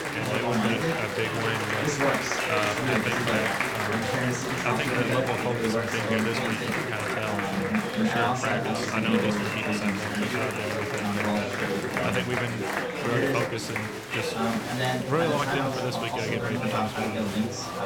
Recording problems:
chatter from many people; very loud; throughout; 4 dB above the speech

